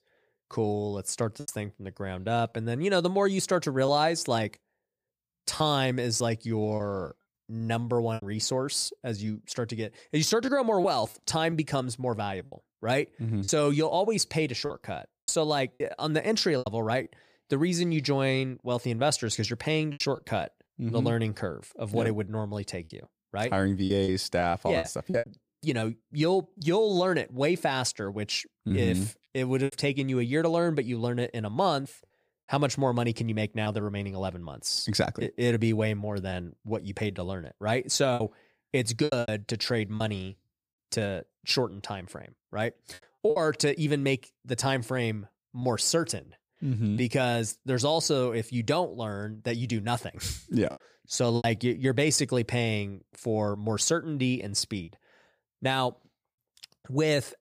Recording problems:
choppy; occasionally; 4% of the speech affected

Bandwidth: 15 kHz